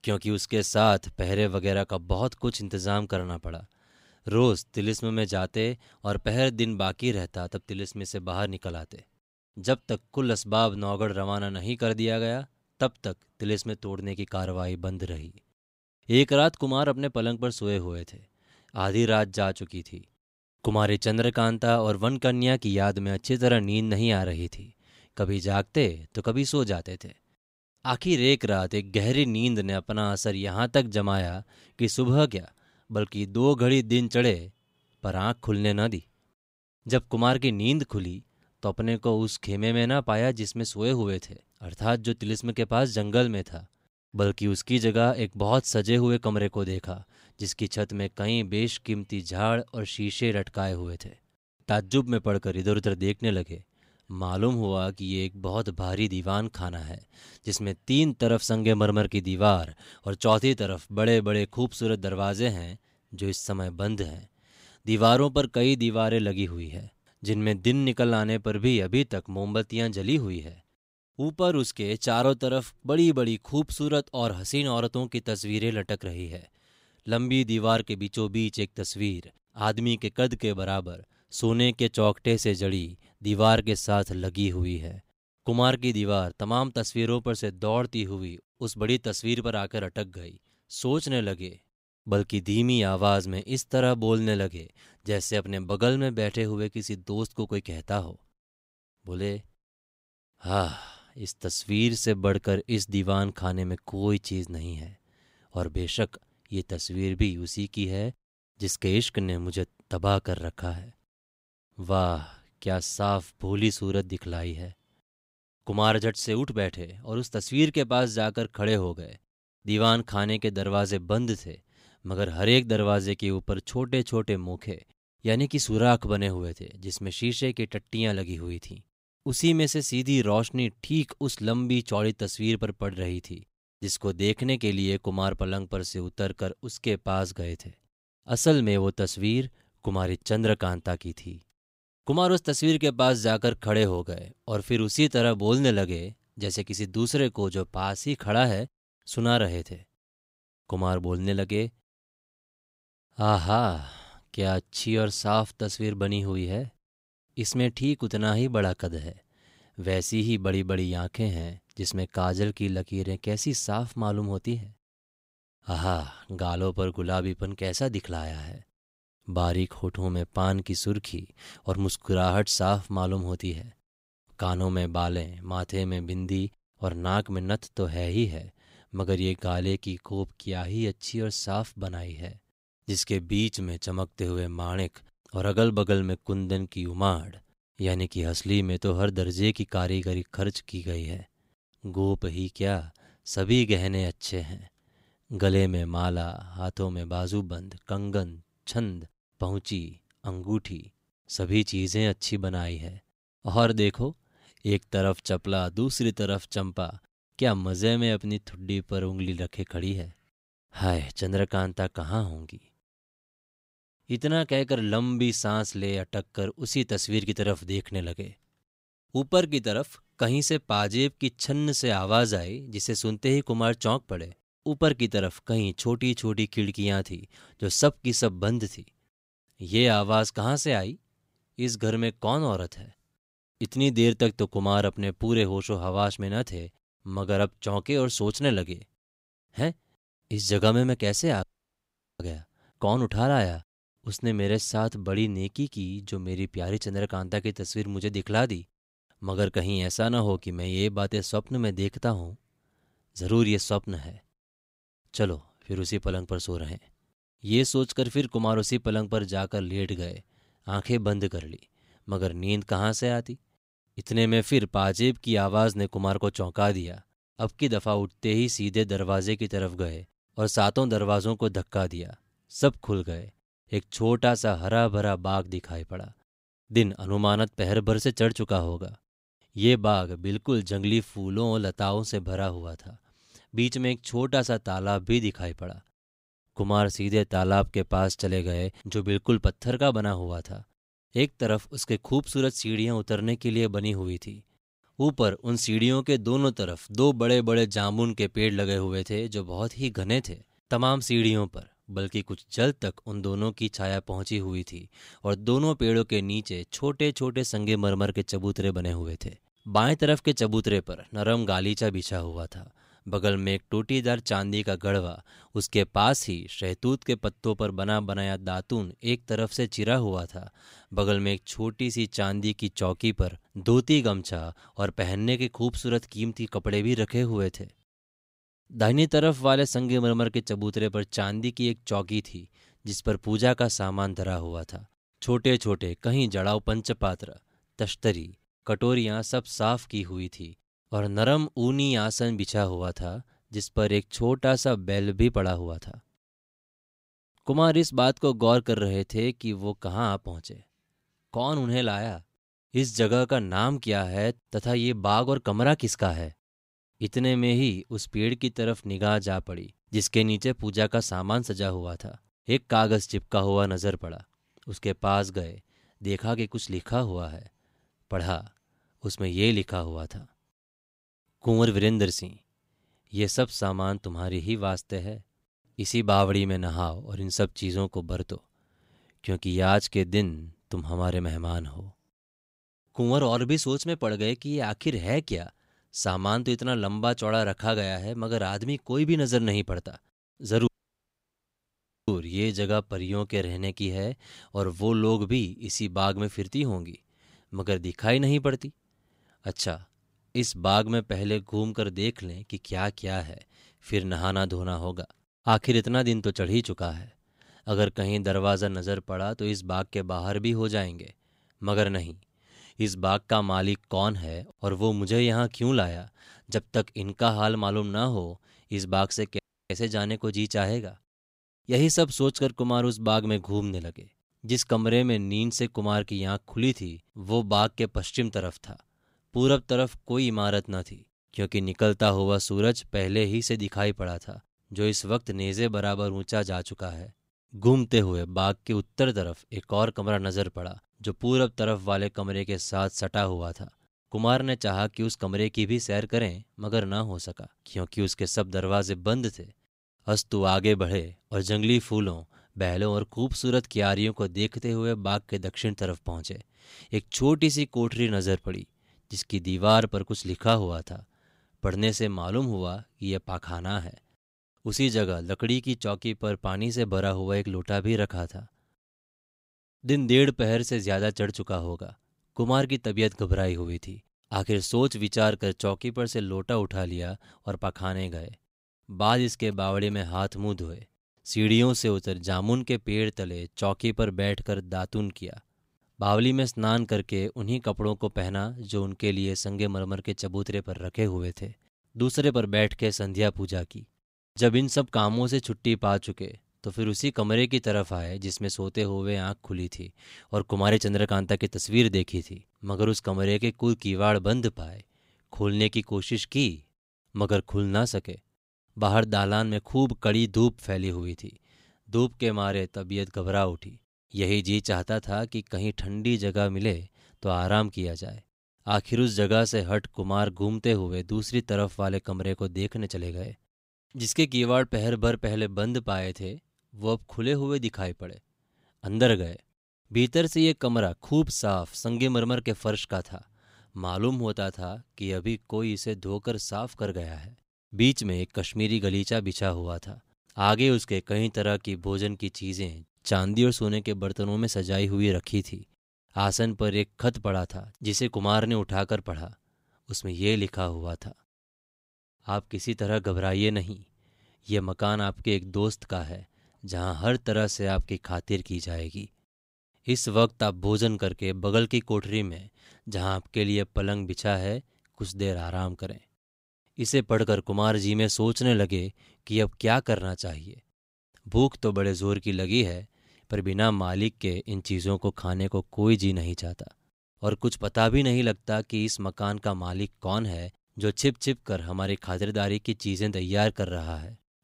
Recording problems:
audio cutting out; at 4:01 for 1 s, at 6:31 for 1.5 s and at 6:59

